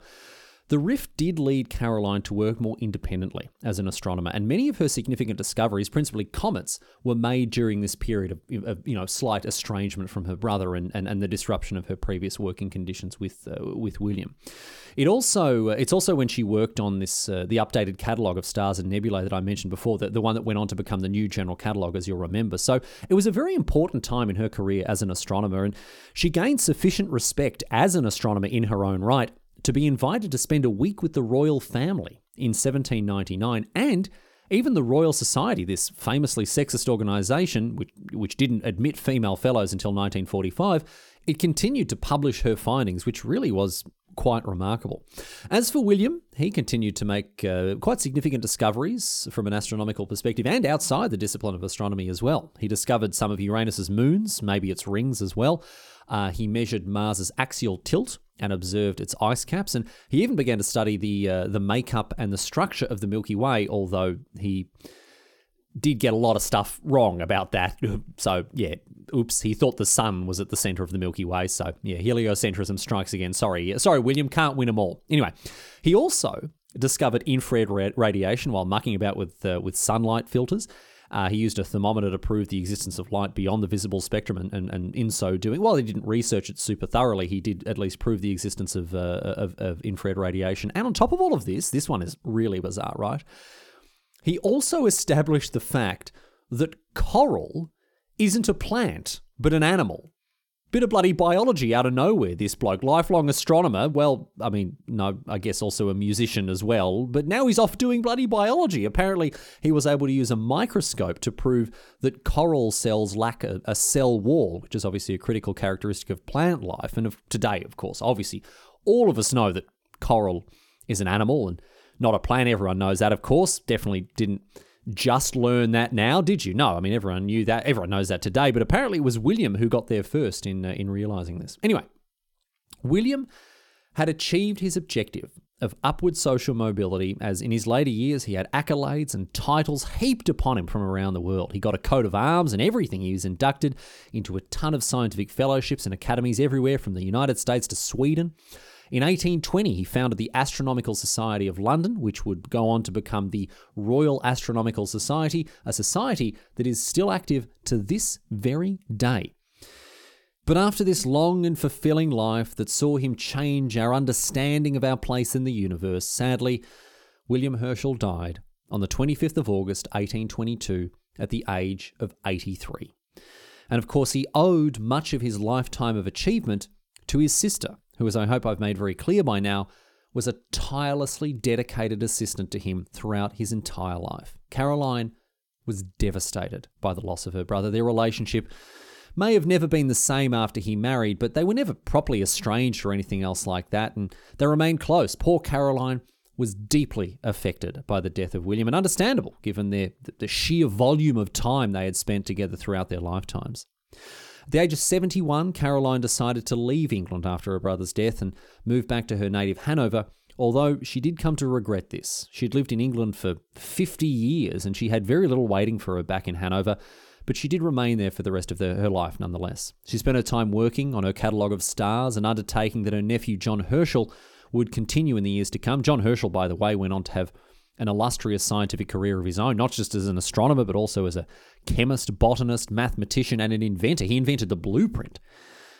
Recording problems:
none

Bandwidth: 18 kHz